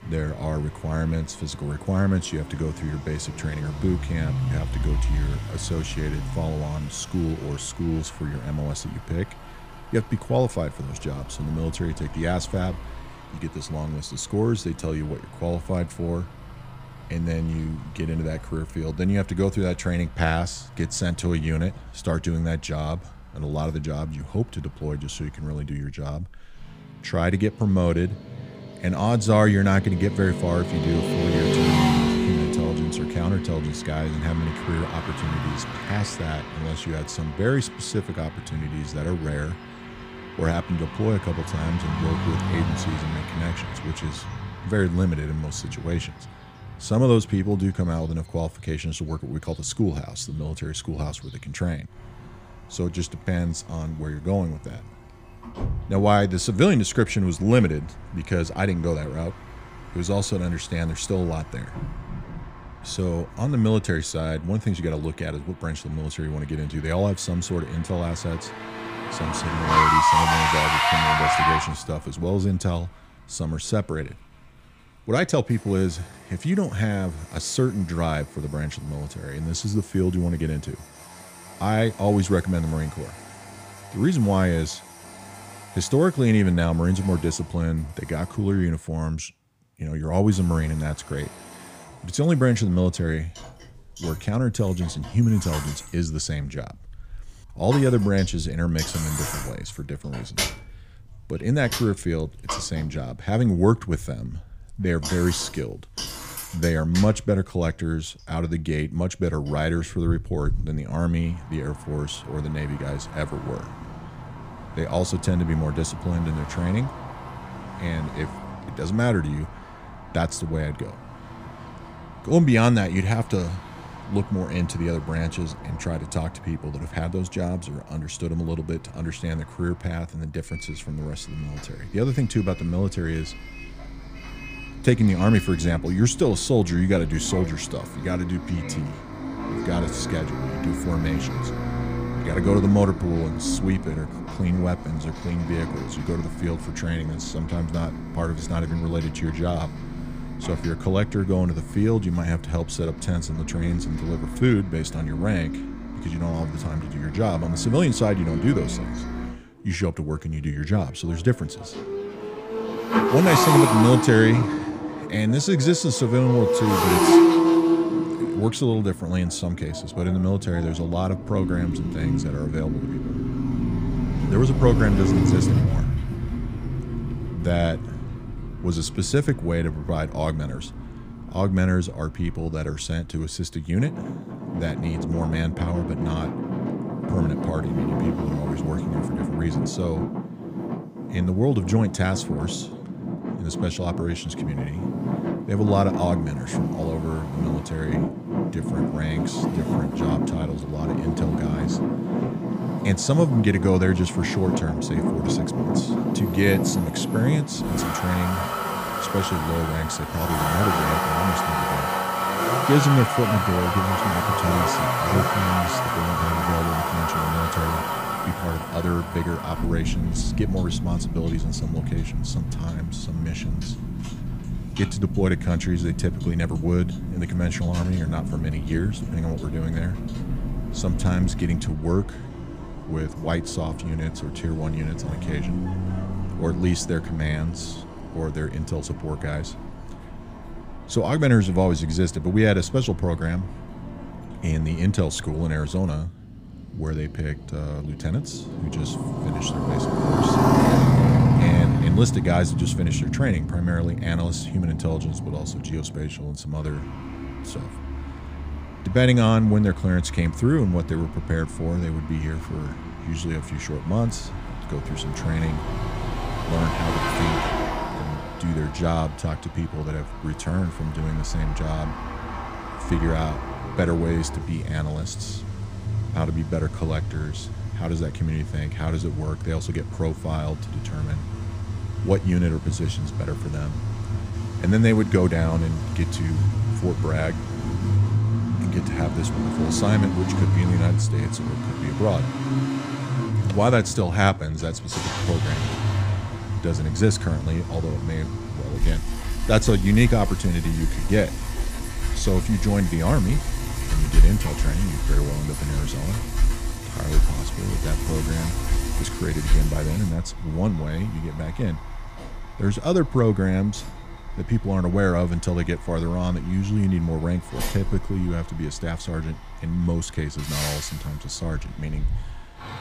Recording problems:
traffic noise; loud; throughout; 2 dB below the speech

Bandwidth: 15 kHz